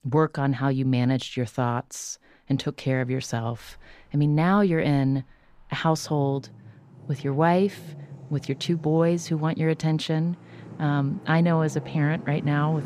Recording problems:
traffic noise; noticeable; throughout; 20 dB below the speech

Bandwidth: 15 kHz